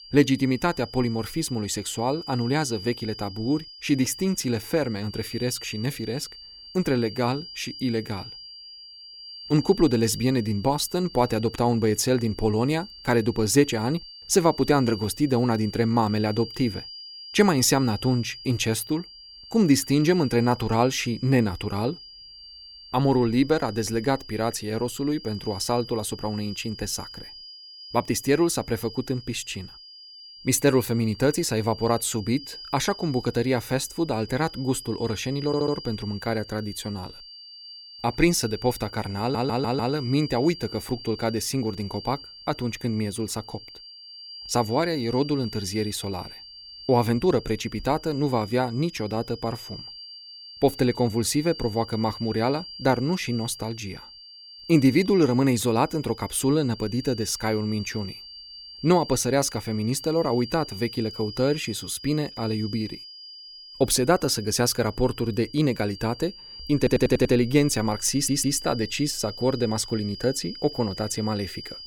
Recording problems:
high-pitched whine; noticeable; throughout; 4.5 kHz, 15 dB below the speech
audio stuttering; 4 times, first at 35 s

